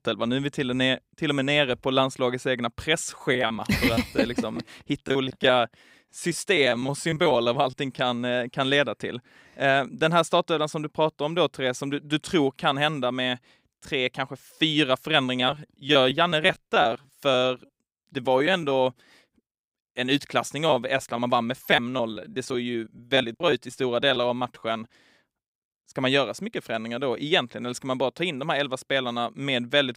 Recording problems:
choppy; very; from 3 to 7.5 s, from 15 to 19 s and from 21 to 25 s; 14% of the speech affected

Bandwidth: 15.5 kHz